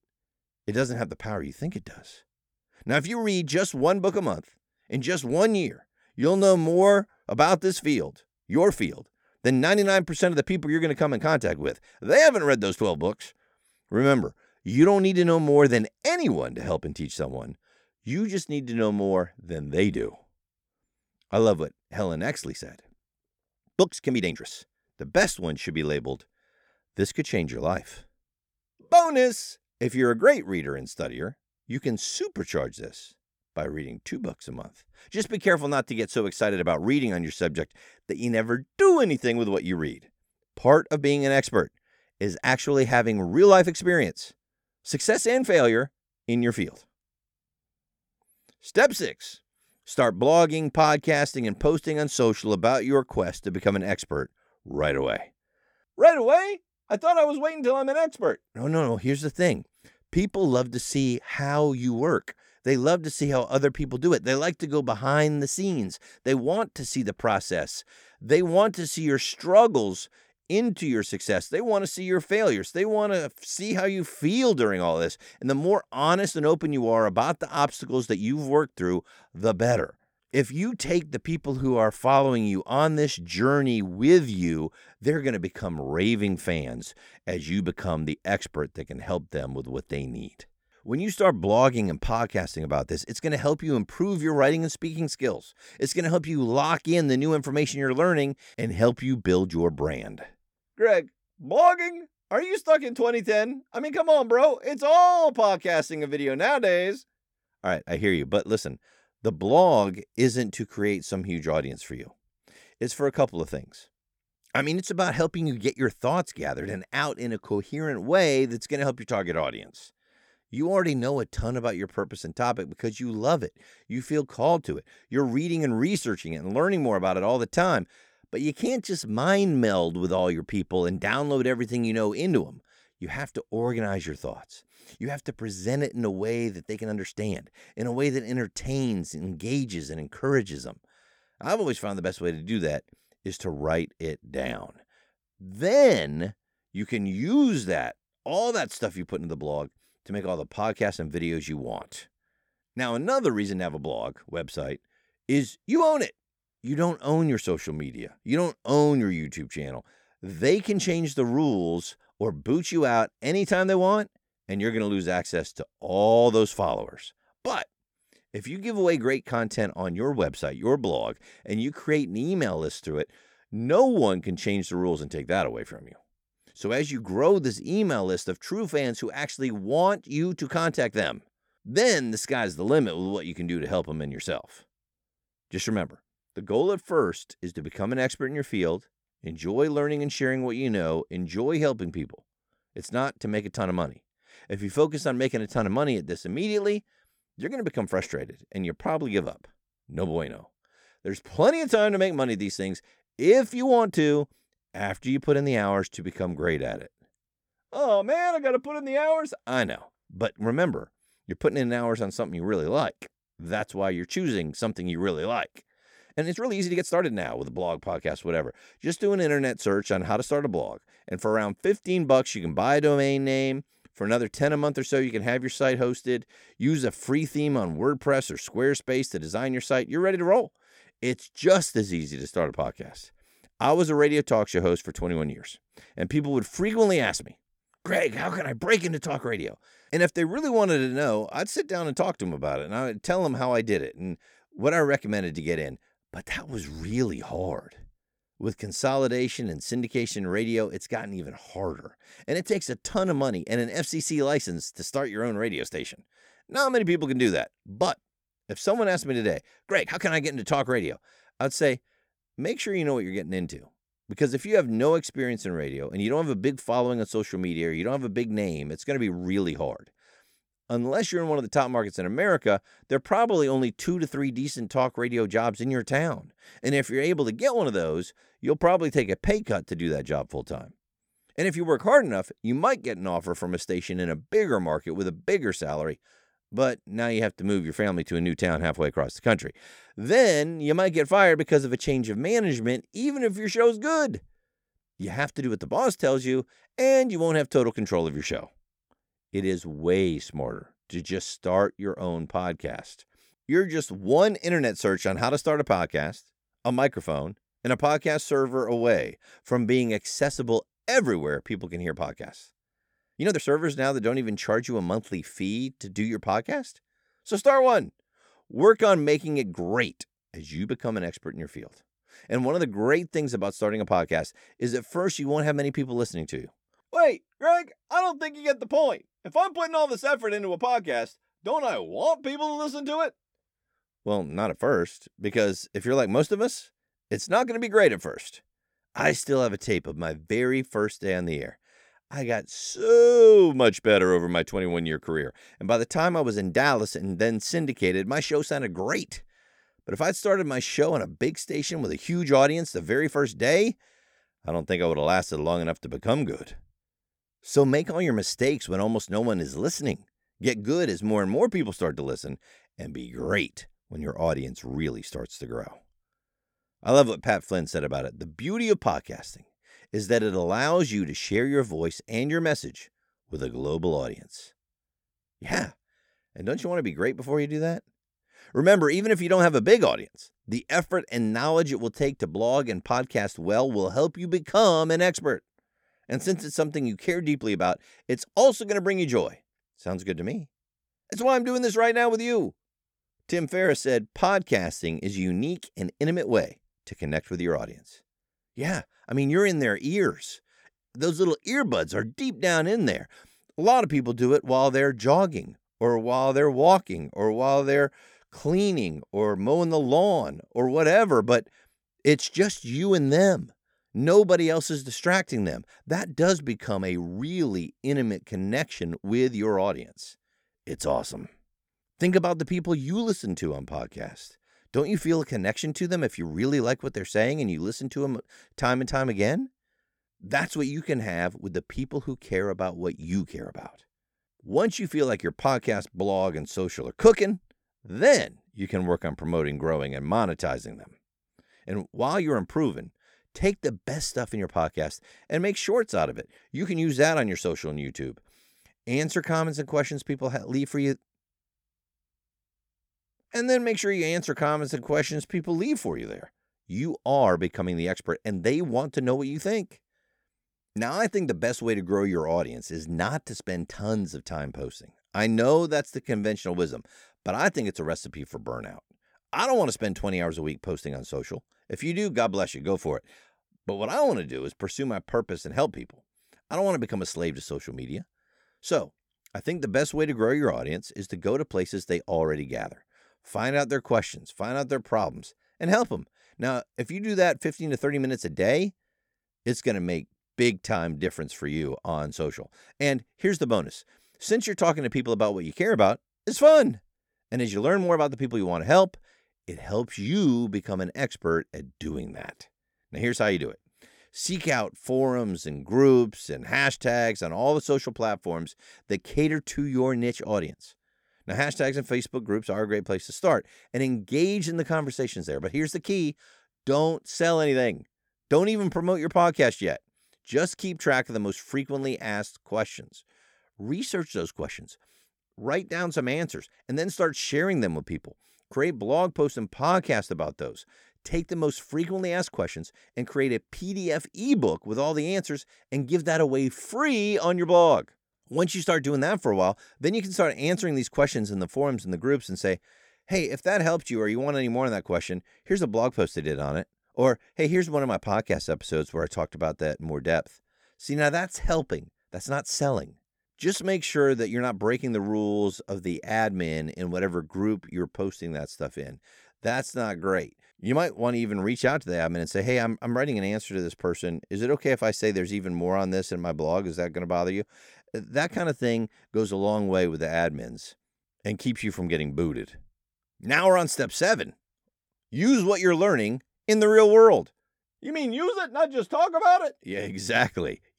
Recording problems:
uneven, jittery; strongly; from 6 s to 9:20

